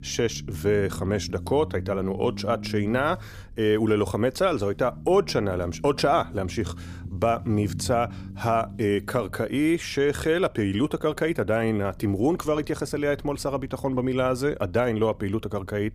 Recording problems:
low rumble; faint; throughout; 20 dB below the speech

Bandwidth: 15 kHz